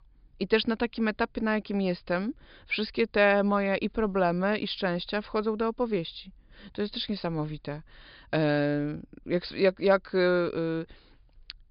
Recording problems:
high frequencies cut off; noticeable; nothing above 5 kHz

